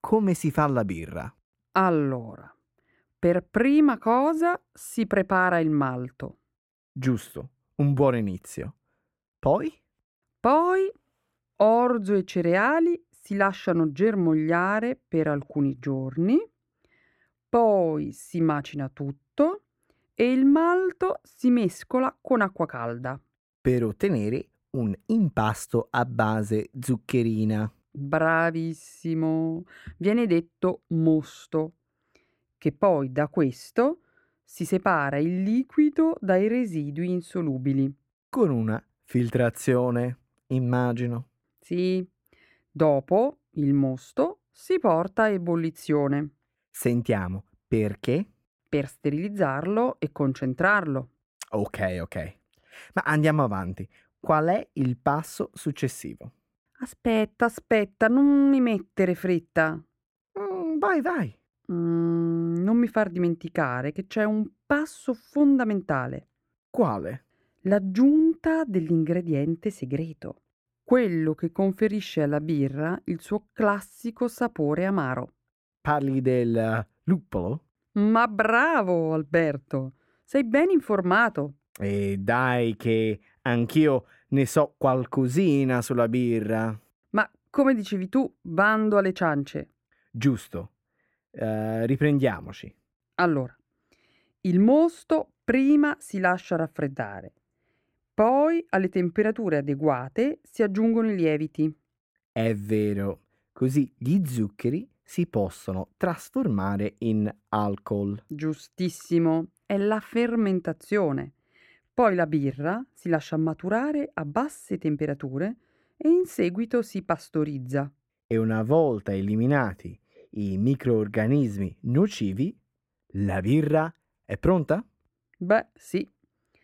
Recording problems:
muffled; slightly; fading above 3 kHz

